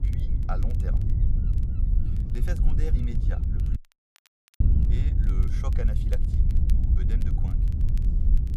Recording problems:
wind noise on the microphone; heavy; as loud as the speech
crackle, like an old record; noticeable; 20 dB below the speech
animal sounds; faint; throughout; 25 dB below the speech
voice in the background; faint; throughout; 30 dB below the speech
audio cutting out; at 4 s for 1 s

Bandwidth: 15 kHz